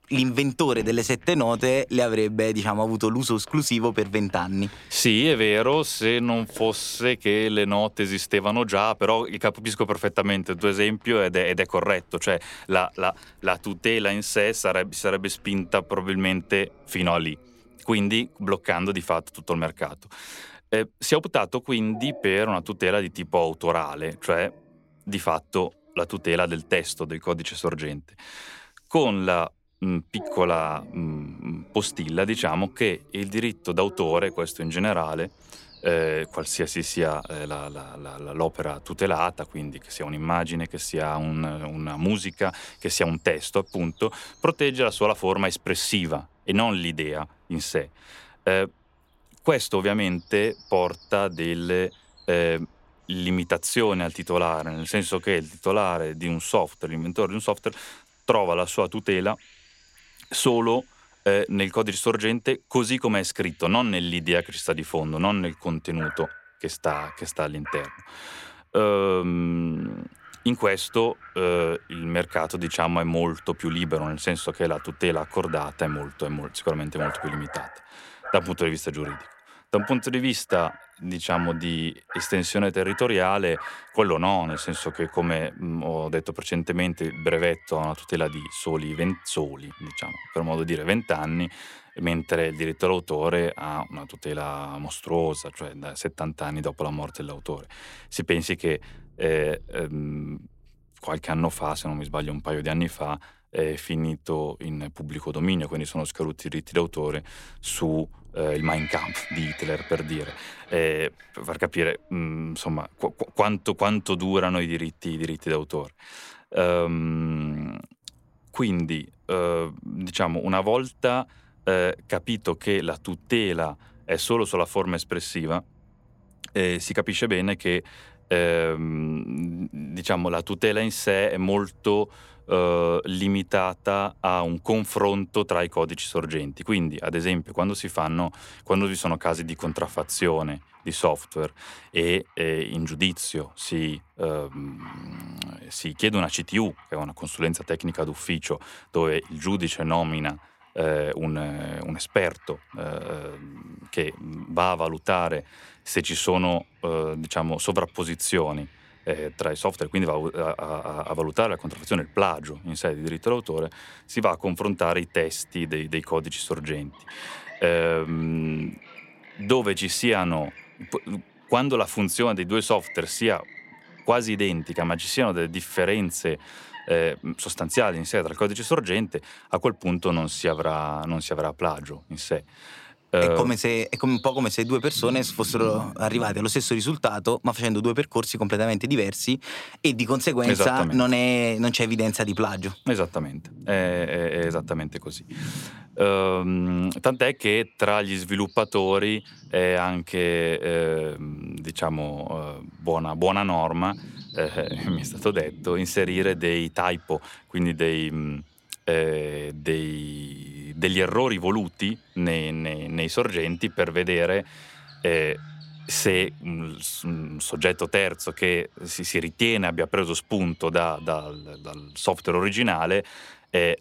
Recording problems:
animal sounds; noticeable; throughout; 20 dB below the speech

